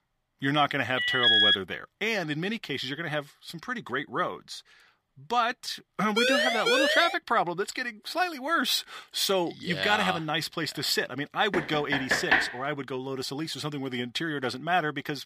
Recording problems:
thin; very slightly; fading below 600 Hz
alarm; loud; at 1 s; peak 10 dB above the speech
siren; loud; at 6 s; peak 5 dB above the speech
door banging; loud; at 12 s; peak 5 dB above the speech

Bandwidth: 15 kHz